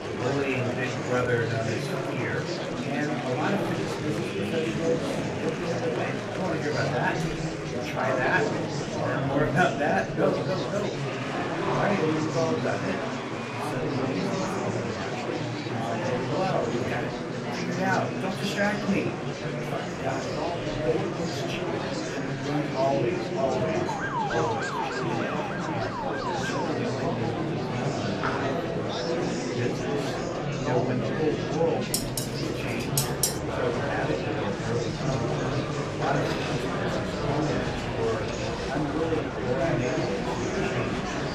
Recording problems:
room echo; very slight; dies away in 0.2 s
off-mic speech; somewhat distant
murmuring crowd; very loud; throughout; 2 dB above the speech
door banging; faint; at 7 s; peak 15 dB below the speech
siren; loud; from 24 to 27 s; peak 1 dB above the speech
clattering dishes; loud; from 32 to 33 s; peak 6 dB above the speech

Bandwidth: 15 kHz